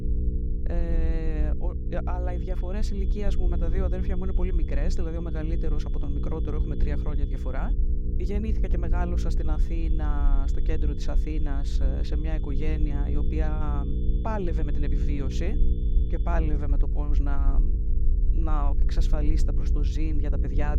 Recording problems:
electrical hum; loud; throughout; 60 Hz, 7 dB below the speech
low rumble; noticeable; throughout; 15 dB below the speech
high-pitched whine; faint; from 2.5 to 7.5 s and from 9.5 to 16 s; 3.5 kHz, 25 dB below the speech

